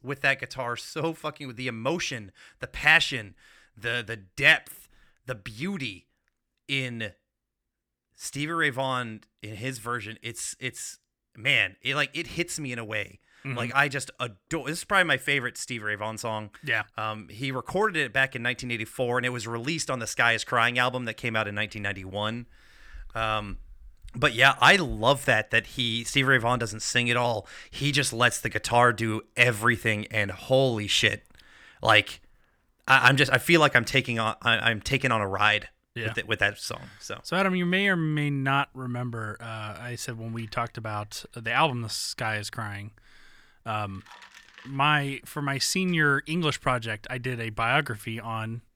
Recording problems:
none

